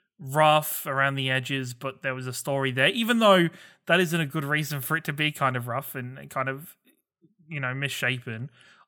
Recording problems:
none

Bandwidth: 18 kHz